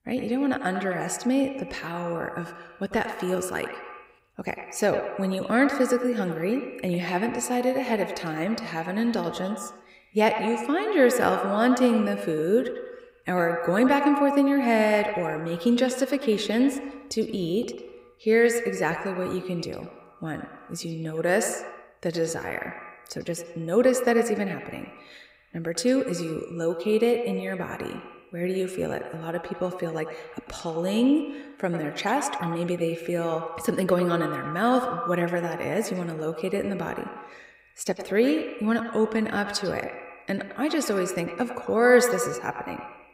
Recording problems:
echo of what is said; strong; throughout; 100 ms later, 8 dB below the speech

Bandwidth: 15.5 kHz